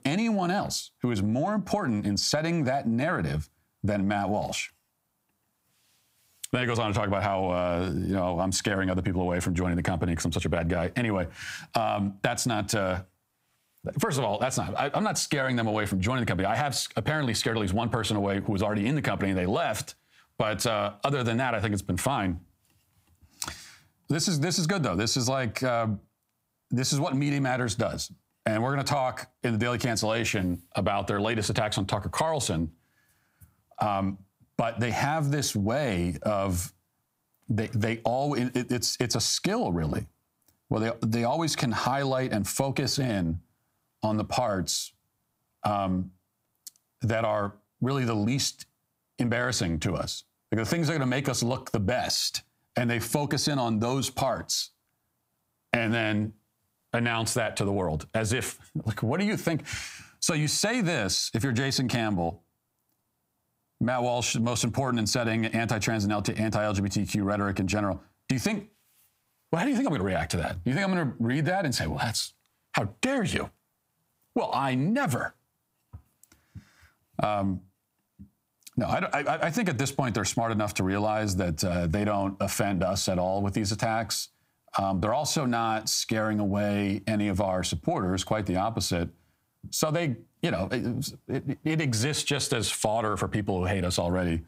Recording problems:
squashed, flat; heavily

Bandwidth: 15.5 kHz